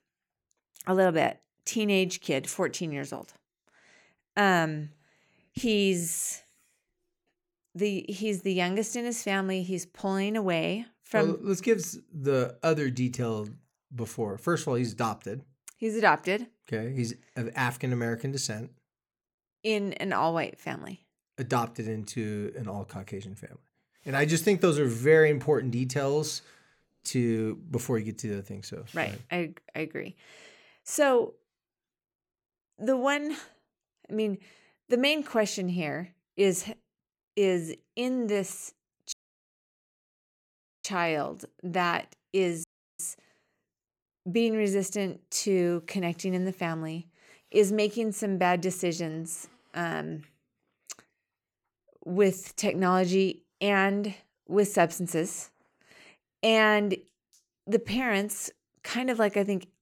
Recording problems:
audio cutting out; at 39 s for 1.5 s and at 43 s

